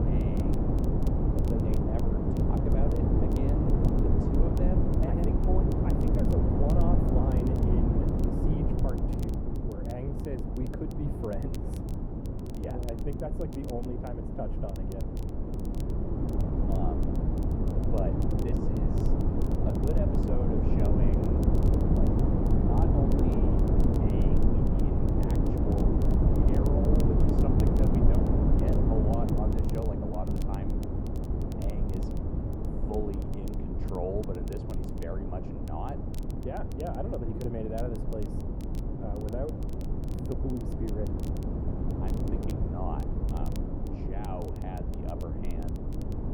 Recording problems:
muffled; very; fading above 1.5 kHz
wind noise on the microphone; heavy; 3 dB above the speech
crackle, like an old record; noticeable; 20 dB below the speech

